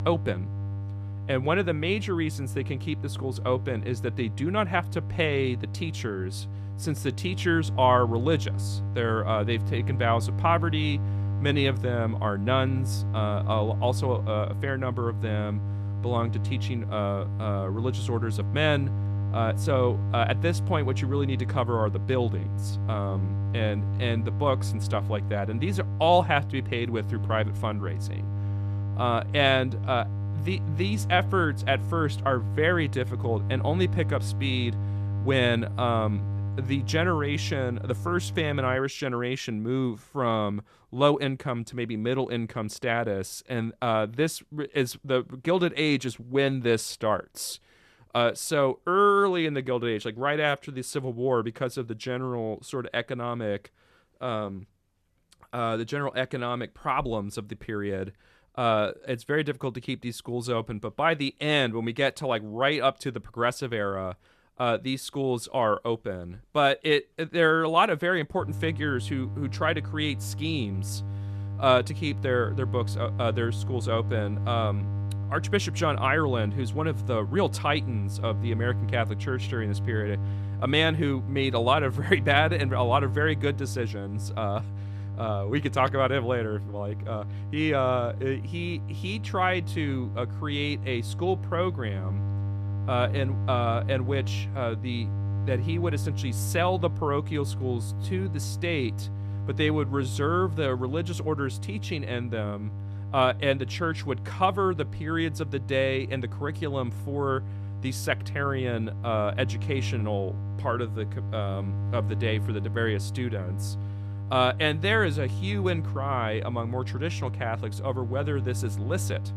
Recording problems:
electrical hum; noticeable; until 39 s and from 1:08 on; 50 Hz, 15 dB below the speech

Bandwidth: 14 kHz